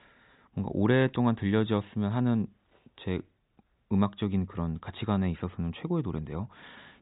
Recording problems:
high frequencies cut off; severe; nothing above 4 kHz

